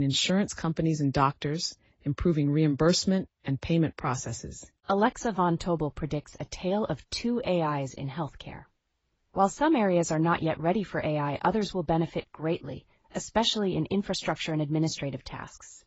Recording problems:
garbled, watery; badly; nothing above 7.5 kHz
abrupt cut into speech; at the start

